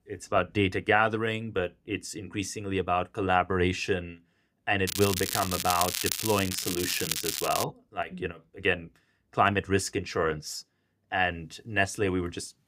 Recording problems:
crackling; loud; from 5 to 7.5 s; 2 dB below the speech

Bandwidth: 15.5 kHz